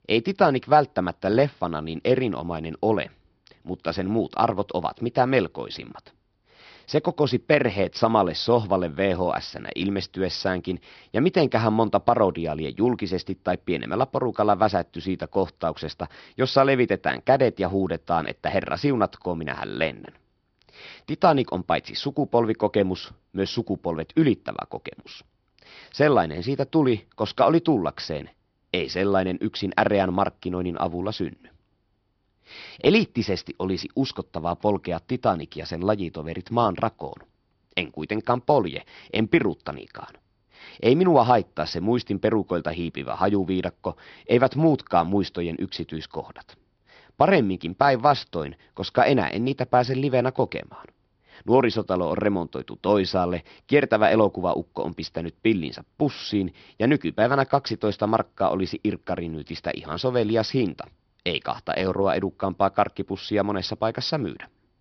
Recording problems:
high frequencies cut off; noticeable; nothing above 5.5 kHz

